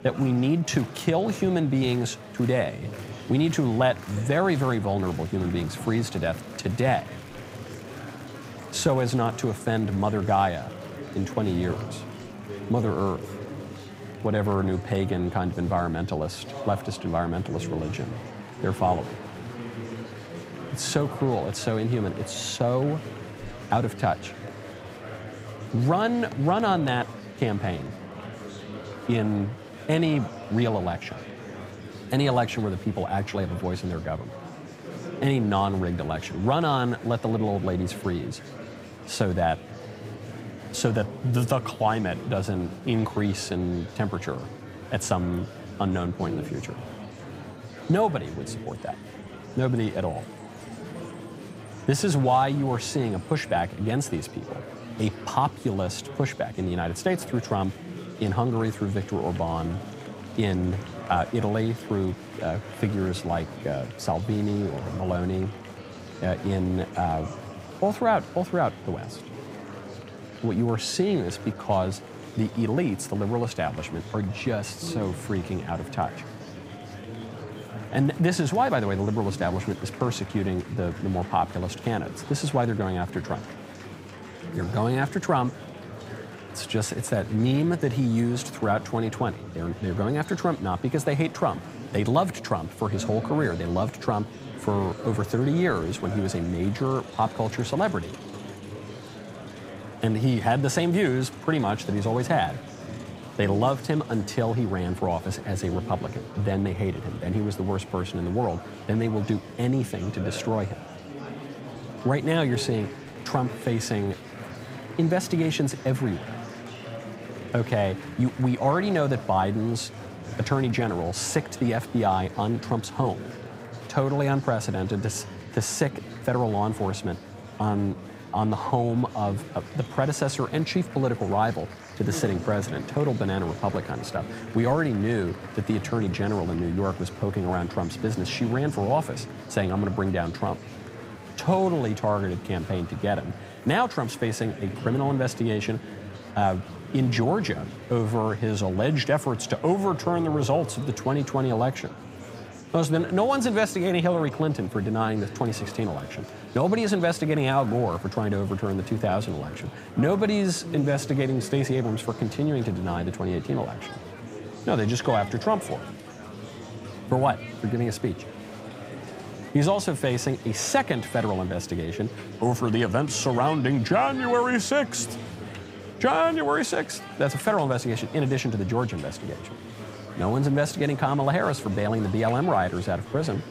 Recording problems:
murmuring crowd; noticeable; throughout; 10 dB below the speech

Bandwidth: 15.5 kHz